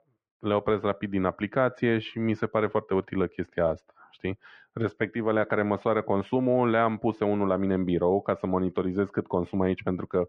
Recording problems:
muffled; very; fading above 2 kHz

